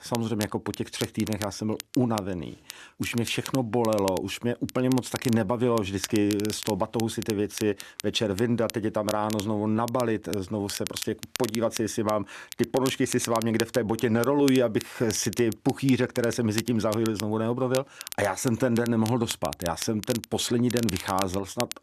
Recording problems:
crackle, like an old record; noticeable; 10 dB below the speech

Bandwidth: 13.5 kHz